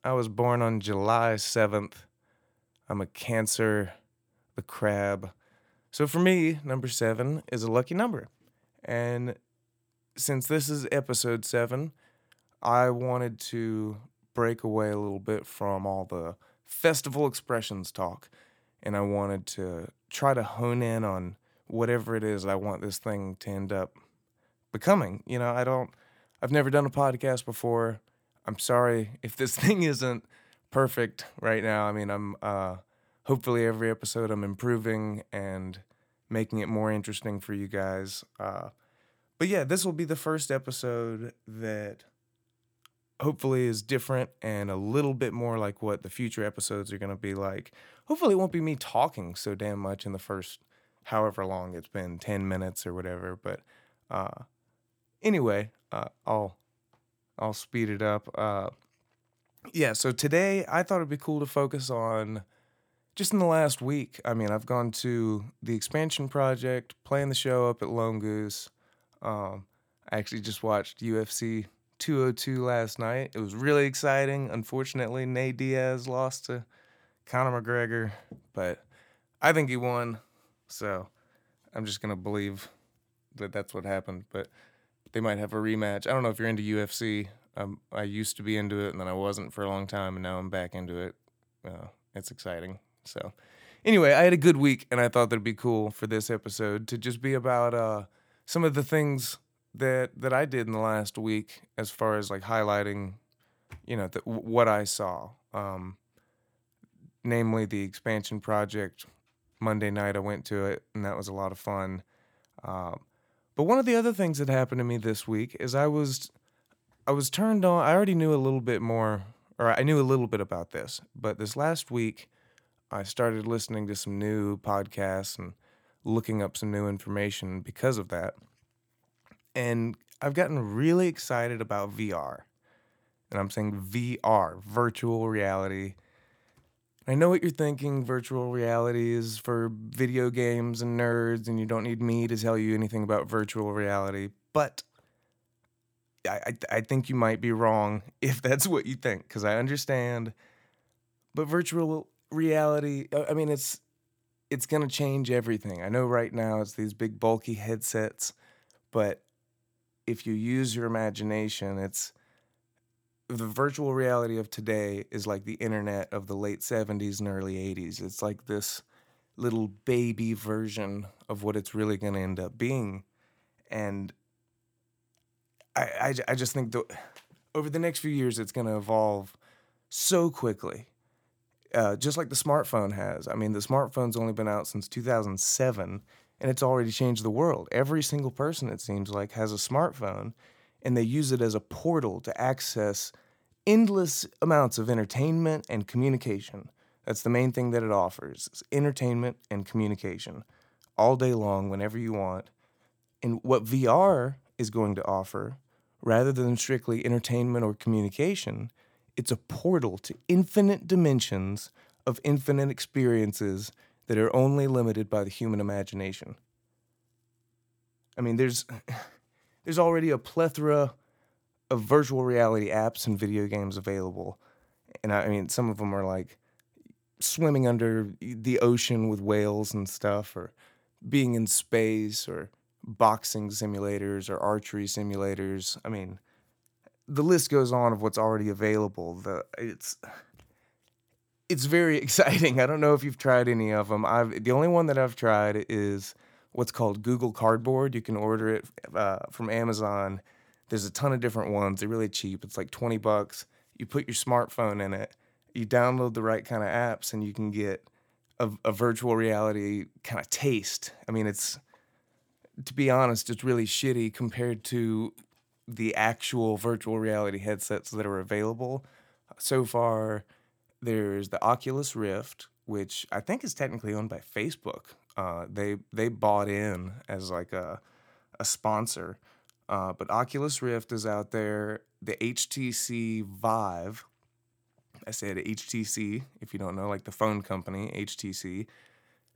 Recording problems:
none

